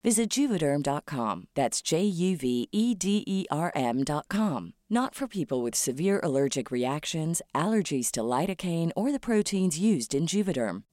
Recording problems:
none

